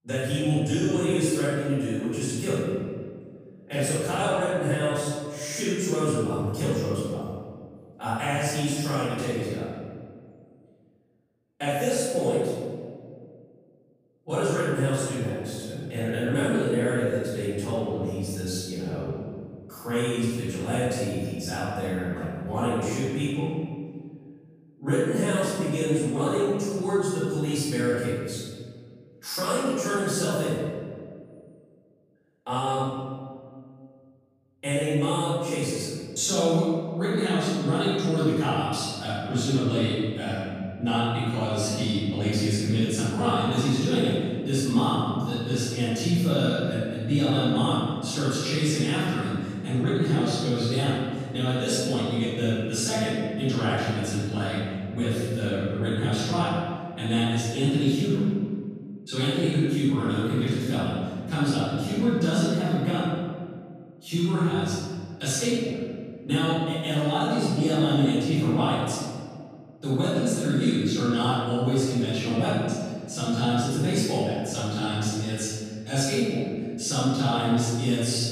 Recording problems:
room echo; strong; dies away in 1.8 s
off-mic speech; far

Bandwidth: 15 kHz